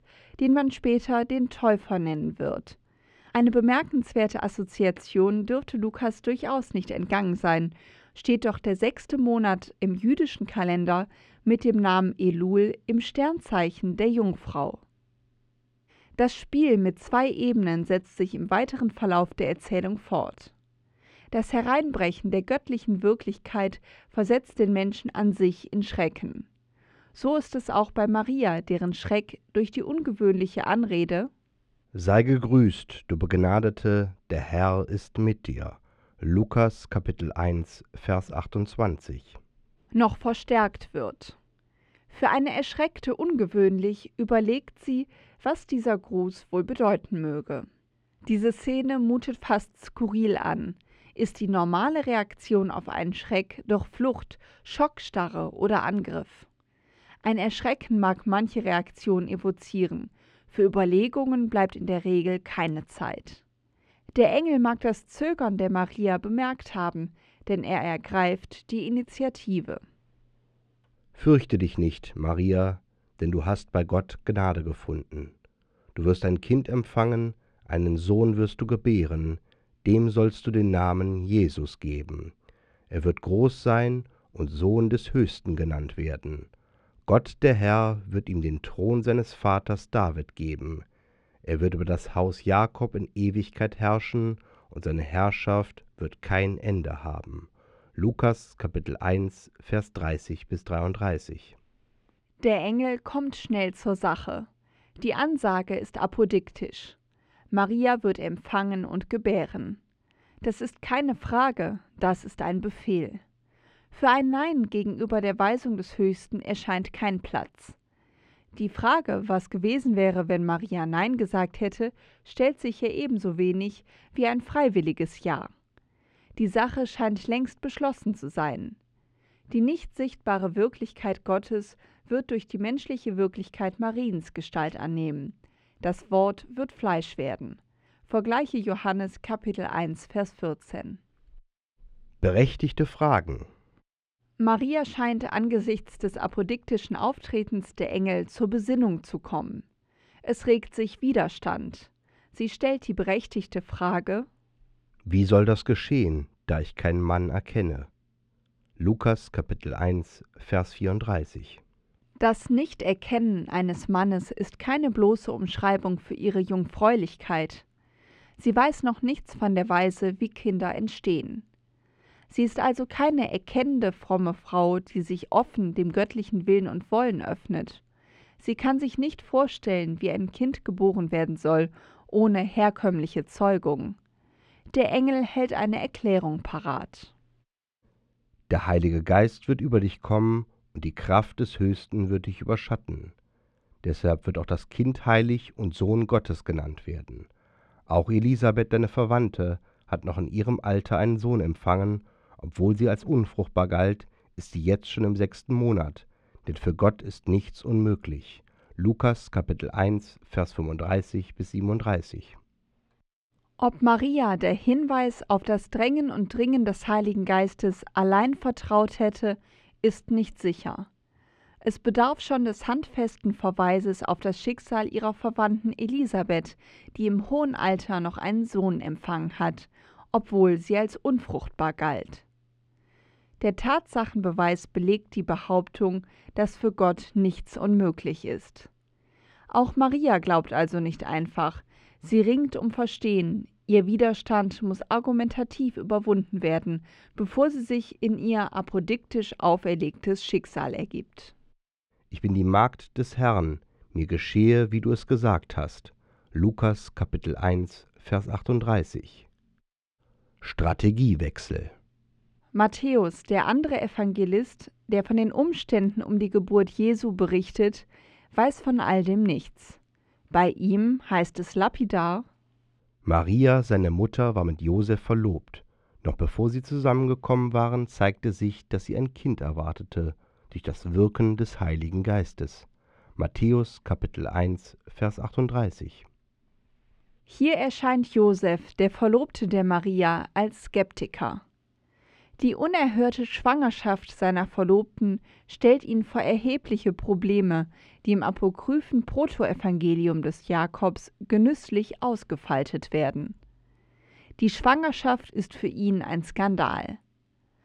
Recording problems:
muffled; slightly; fading above 3 kHz

